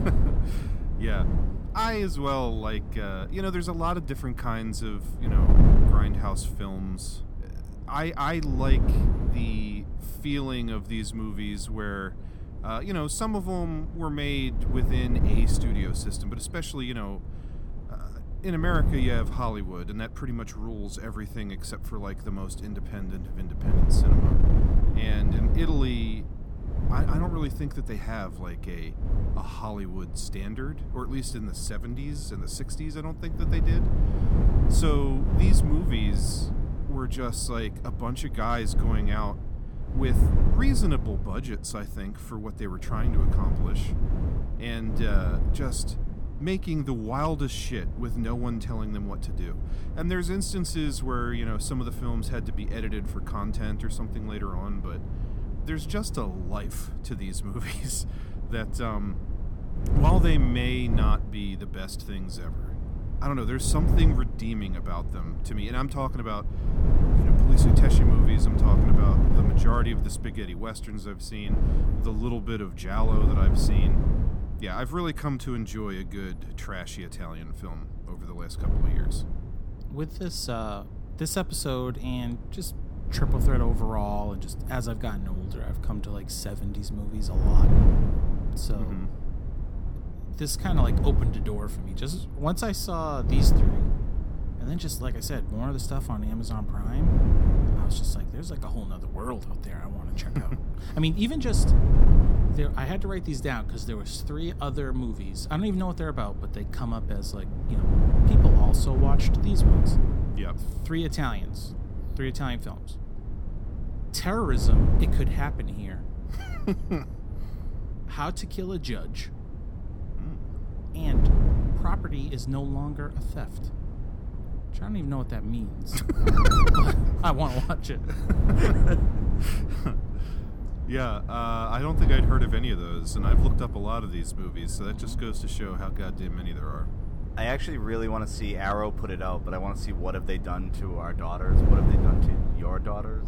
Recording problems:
wind noise on the microphone; heavy; 6 dB below the speech

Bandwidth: 18 kHz